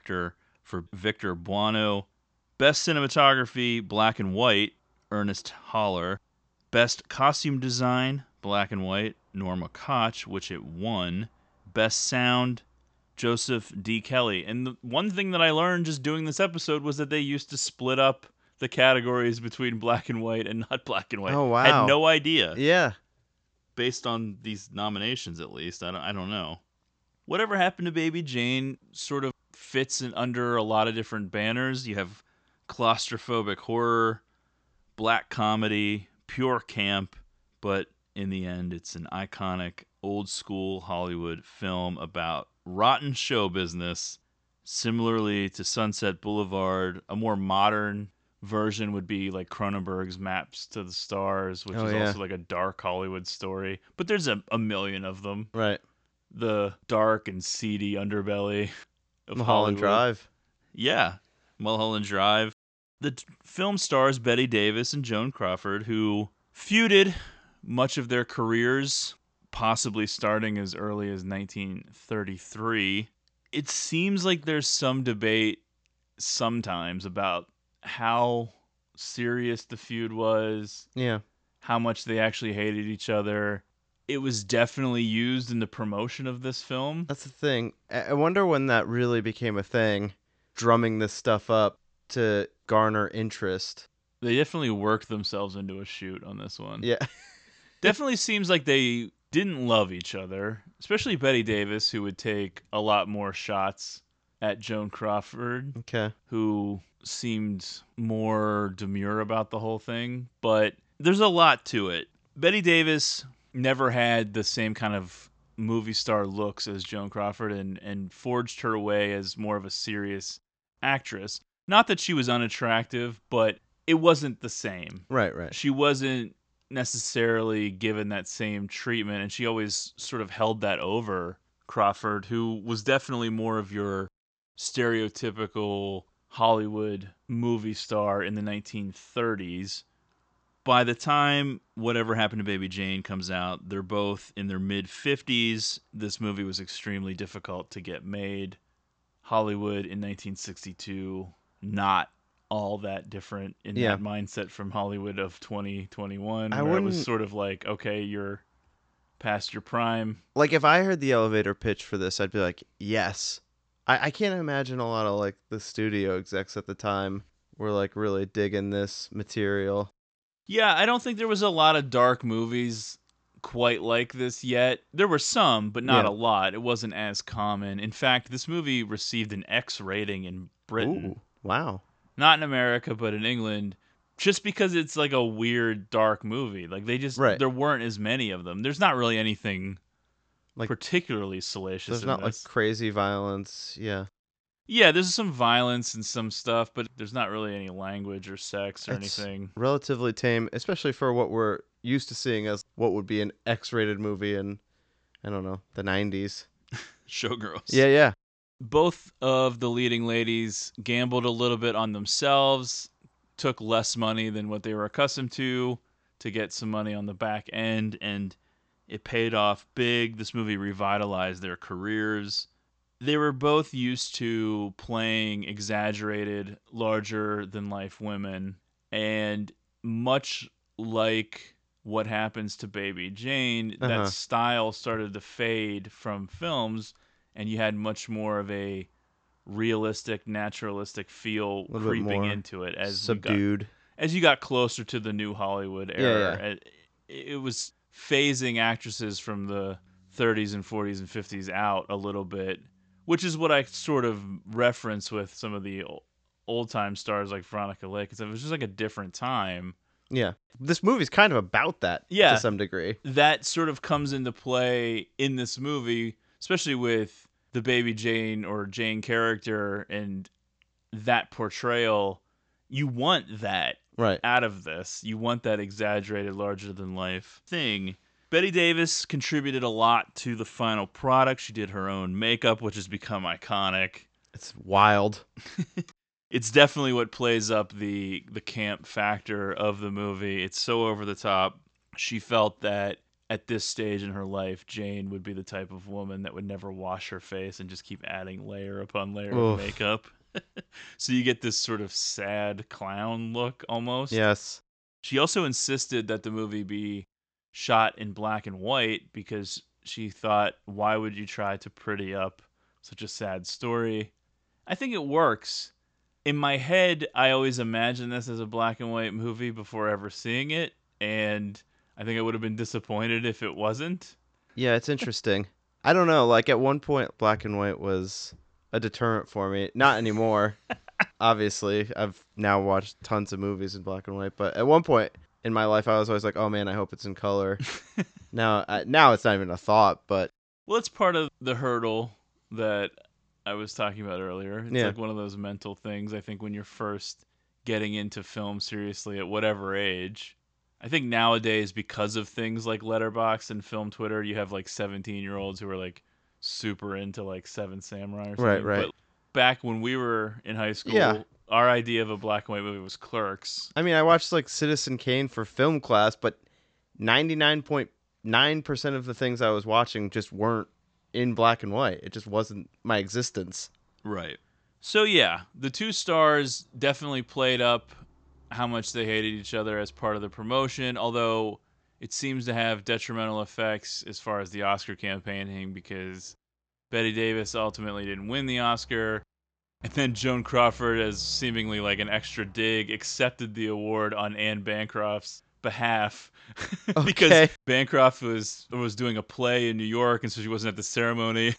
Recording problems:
high frequencies cut off; noticeable; nothing above 8 kHz

